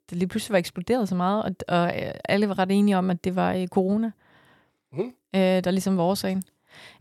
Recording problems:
none

